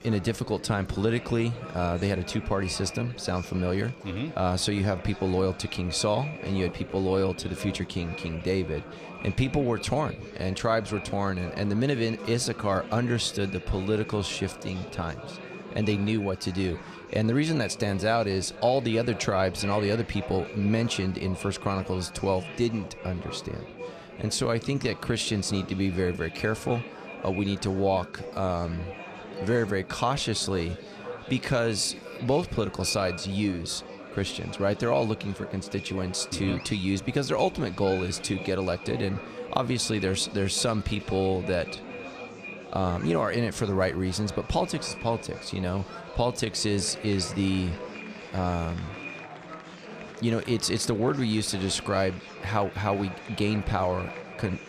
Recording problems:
echo of what is said; noticeable; throughout; 500 ms later, 15 dB below the speech
murmuring crowd; noticeable; throughout; 15 dB below the speech

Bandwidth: 14.5 kHz